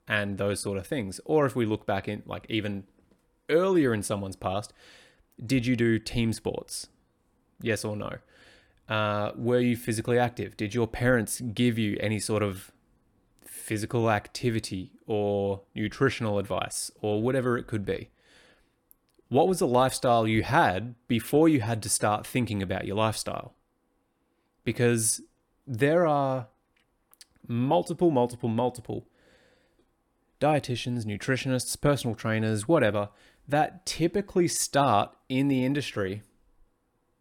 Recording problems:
none

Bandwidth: 18 kHz